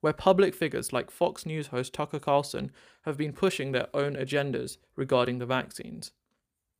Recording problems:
none

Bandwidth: 15 kHz